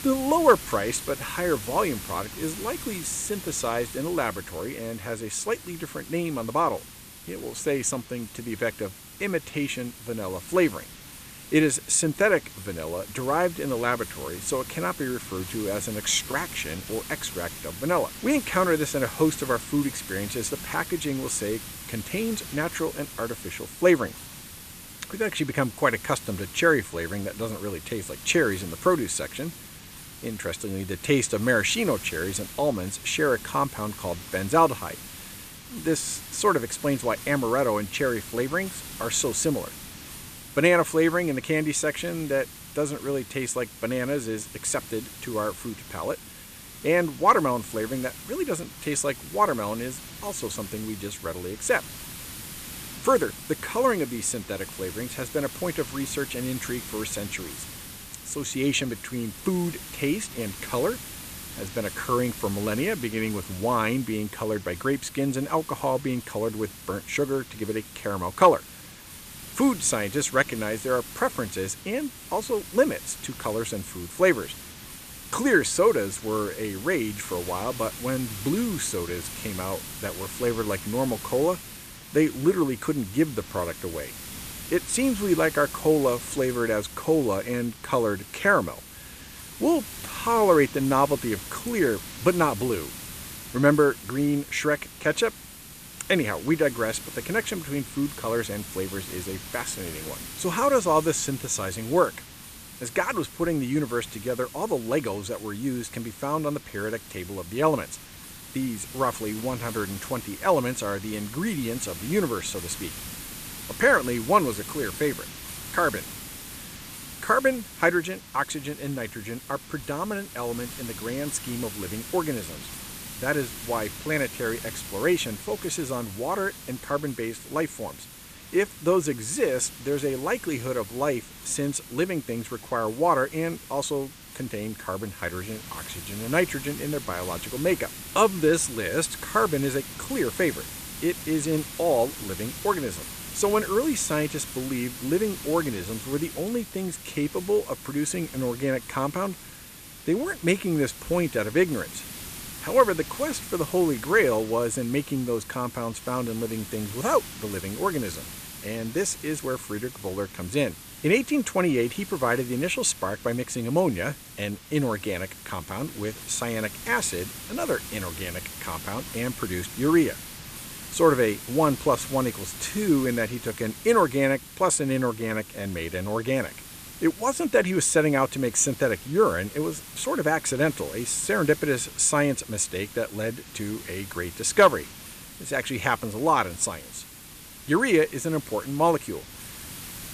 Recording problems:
hiss; noticeable; throughout; 10 dB below the speech

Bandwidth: 14.5 kHz